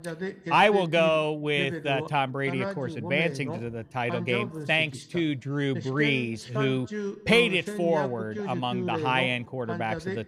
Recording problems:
voice in the background; loud; throughout; 9 dB below the speech

